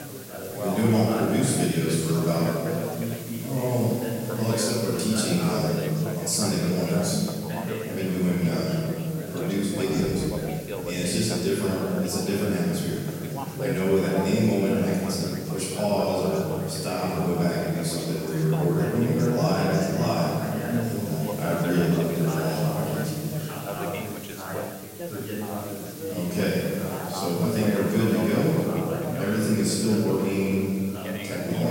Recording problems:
room echo; strong; dies away in 2.3 s
off-mic speech; far
background chatter; loud; throughout; 4 voices, 7 dB below the speech
hiss; noticeable; throughout; 15 dB below the speech
abrupt cut into speech; at the end

